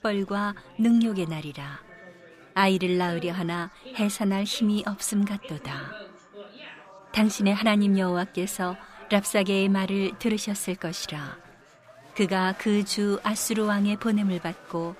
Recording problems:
chatter from many people; faint; throughout; 20 dB below the speech

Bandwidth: 15 kHz